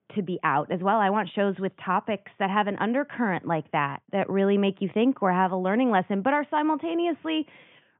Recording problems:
high frequencies cut off; severe; nothing above 3.5 kHz

